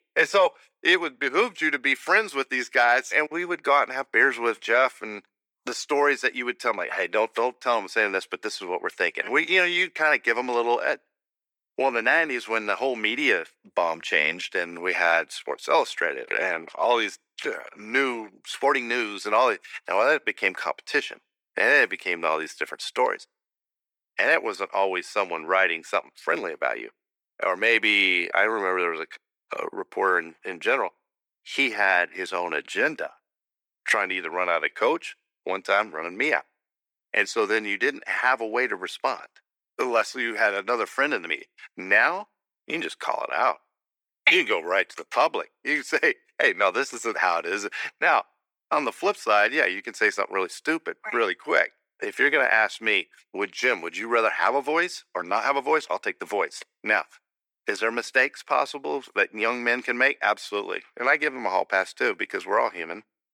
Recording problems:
thin; very; fading below 350 Hz

